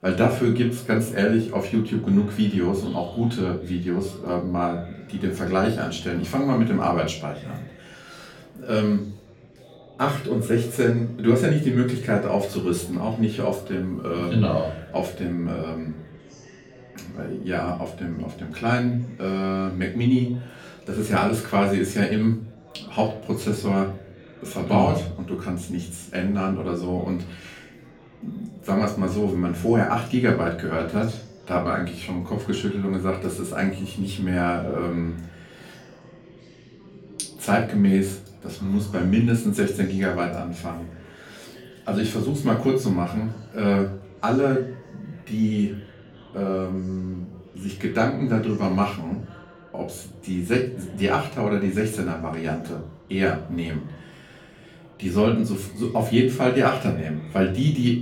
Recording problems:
off-mic speech; far
room echo; slight; dies away in 0.4 s
chatter from many people; faint; throughout; 25 dB below the speech

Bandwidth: 18 kHz